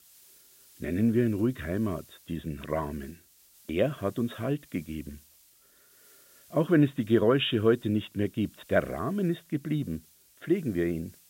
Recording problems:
high frequencies cut off; severe; nothing above 4 kHz
hiss; faint; throughout; 25 dB below the speech

